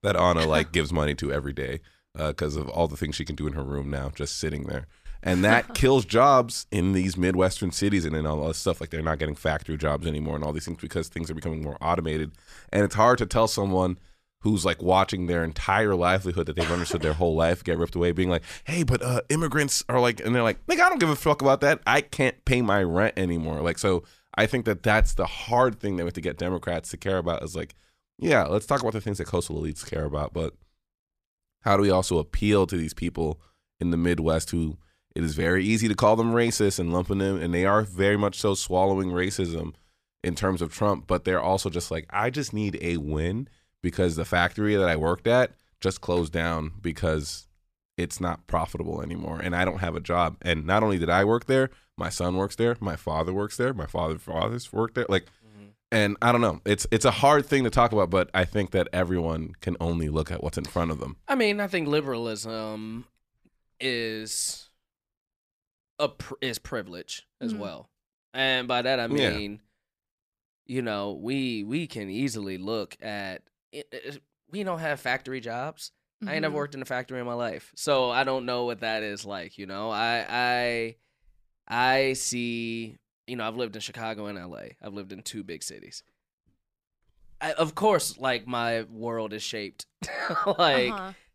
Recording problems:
none

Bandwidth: 14.5 kHz